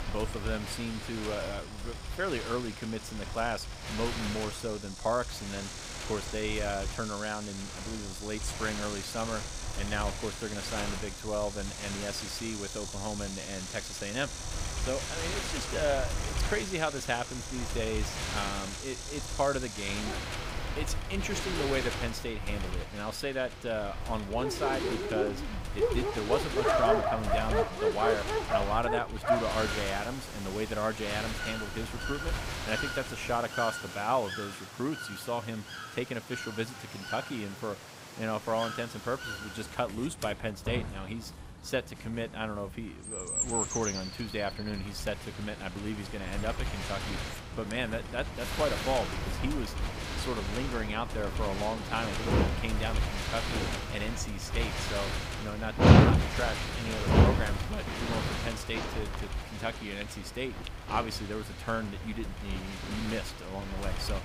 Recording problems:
animal sounds; very loud; throughout; 1 dB above the speech
wind noise on the microphone; heavy; until 33 s and from 43 s on; 4 dB below the speech
train or aircraft noise; noticeable; from 26 s on; 20 dB below the speech

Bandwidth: 15.5 kHz